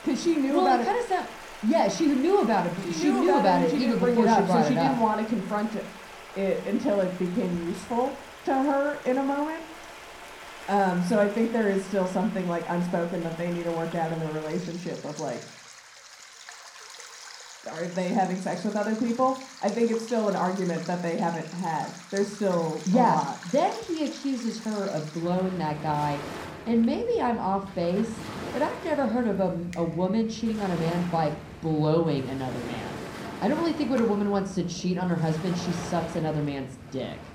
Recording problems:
room echo; slight; dies away in 0.6 s
off-mic speech; somewhat distant
rain or running water; noticeable; throughout; 15 dB below the speech

